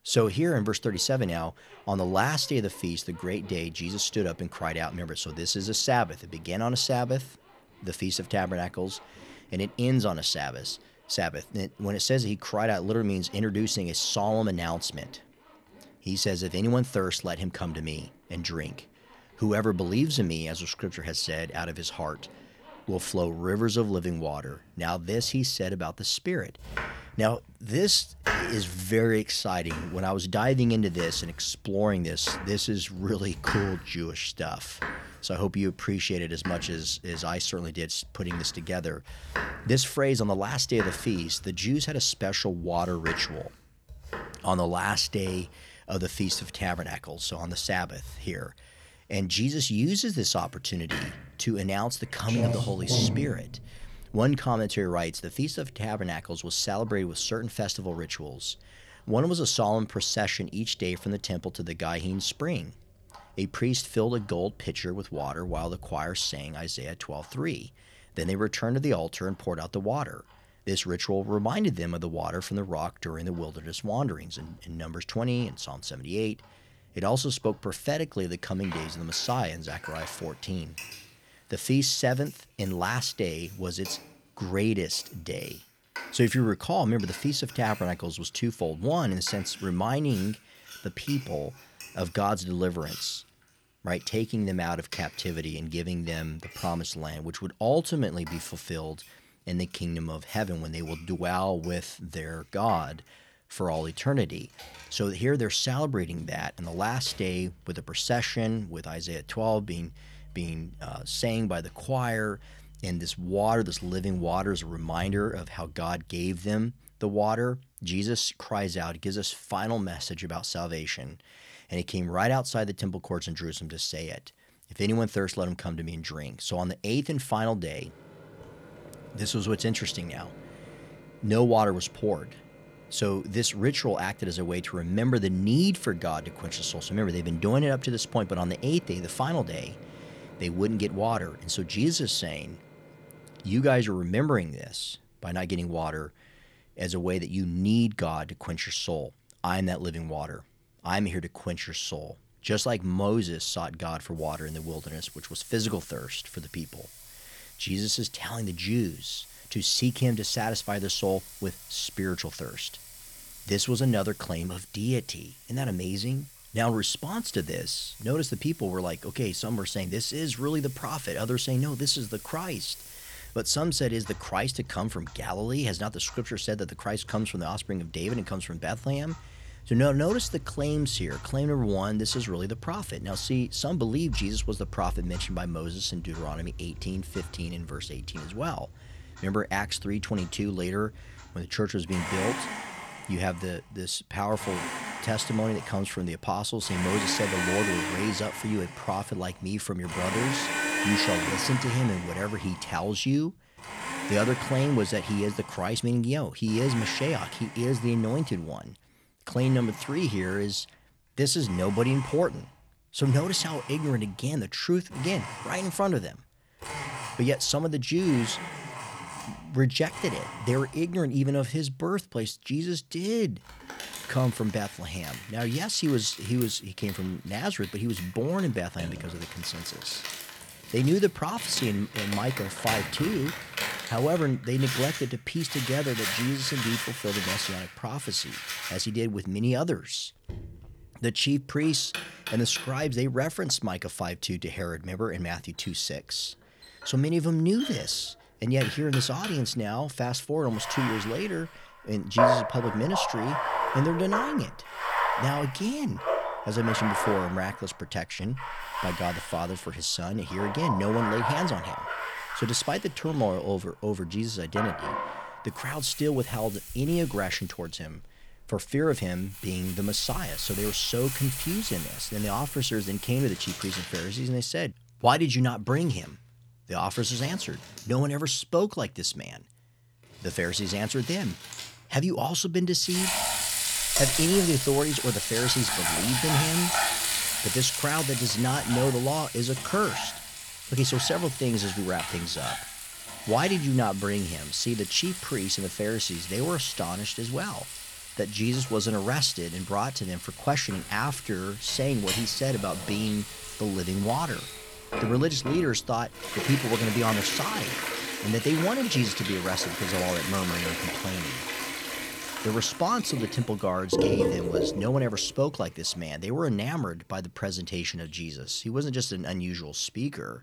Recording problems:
household noises; loud; throughout; 5 dB below the speech

